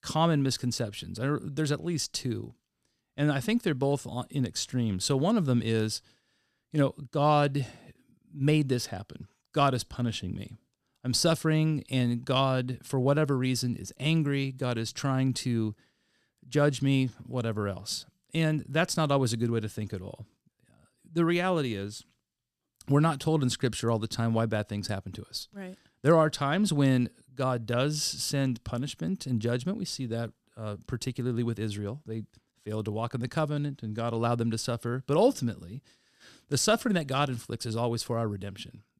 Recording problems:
none

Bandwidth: 14.5 kHz